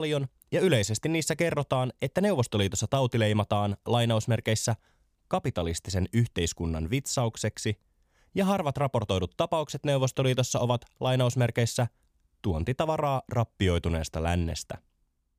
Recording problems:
abrupt cut into speech; at the start

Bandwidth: 15 kHz